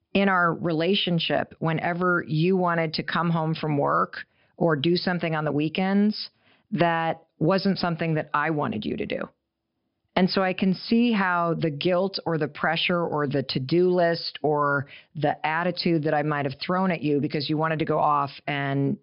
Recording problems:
high frequencies cut off; noticeable; nothing above 5.5 kHz

